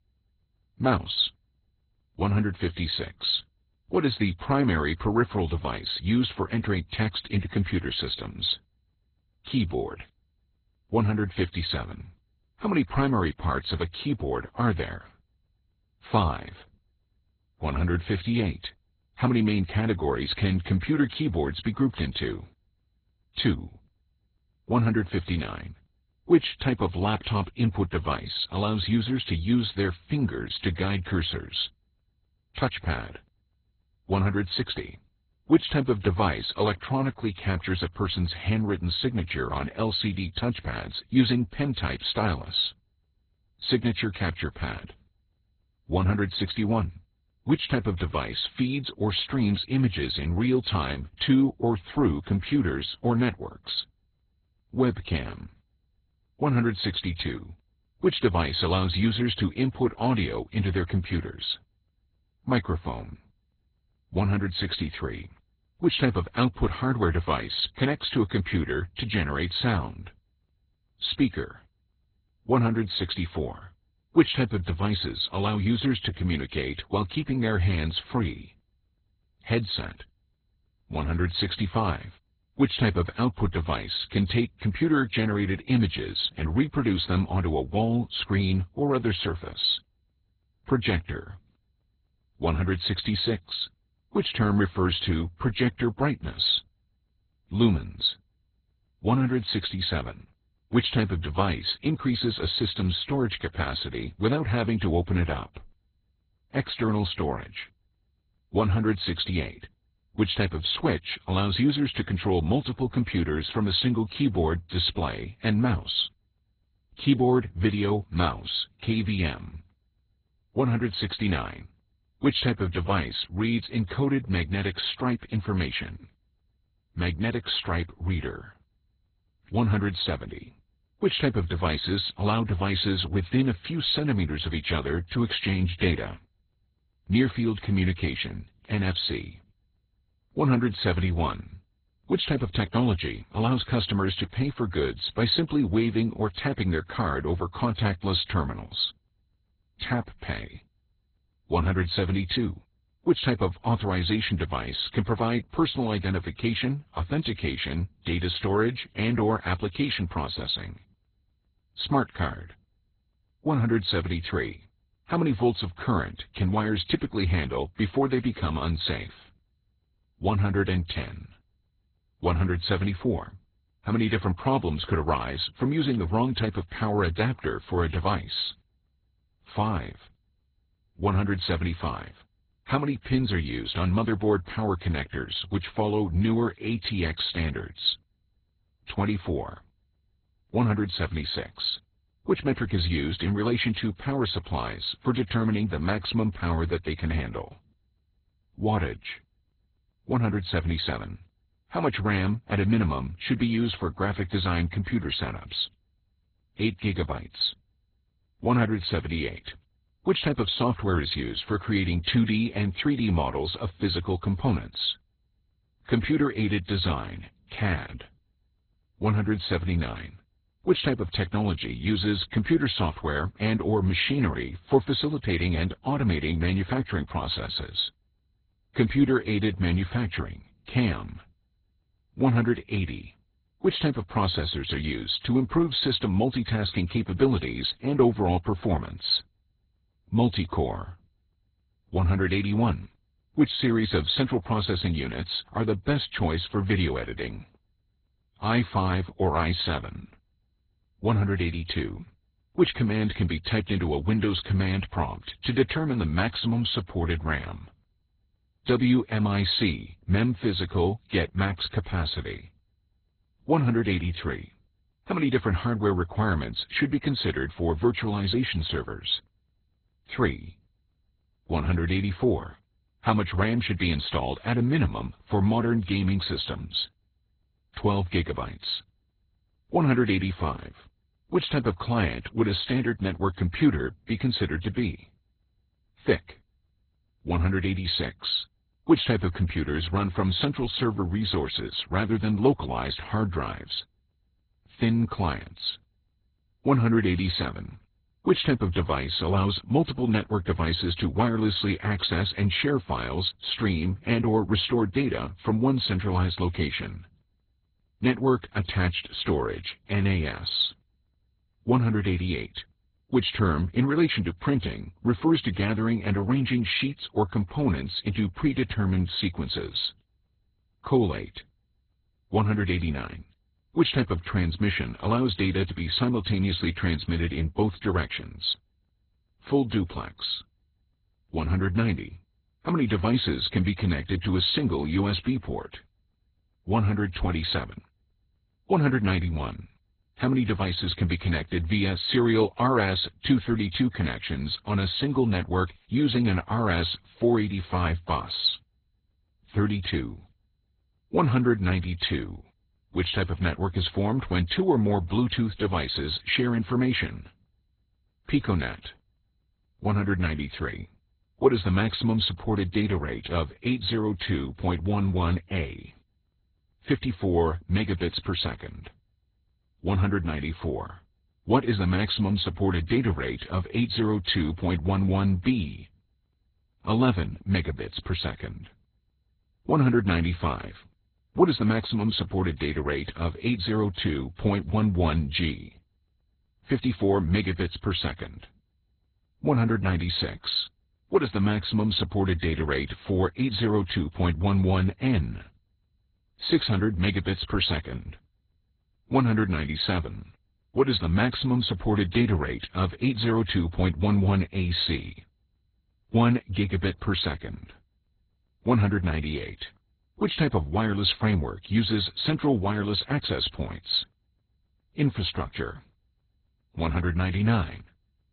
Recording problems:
garbled, watery; badly; nothing above 4 kHz

